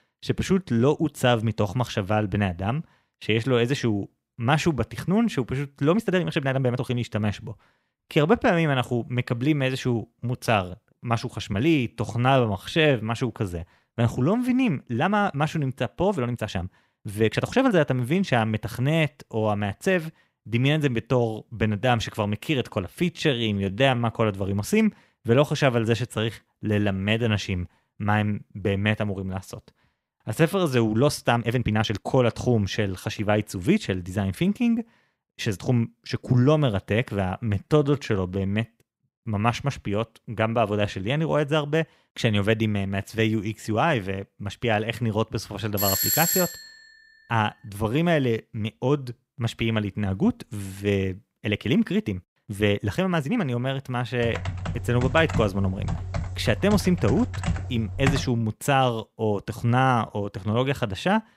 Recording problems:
uneven, jittery; strongly; from 6 to 53 s
doorbell; loud; at 46 s; peak 4 dB above the speech
keyboard typing; noticeable; from 54 to 58 s; peak 3 dB below the speech

